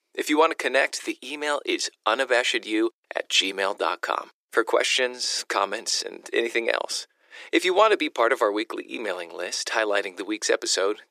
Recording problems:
thin; very; fading below 350 Hz

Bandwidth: 14.5 kHz